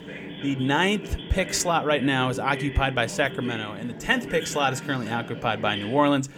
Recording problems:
voice in the background; noticeable; throughout; 10 dB below the speech

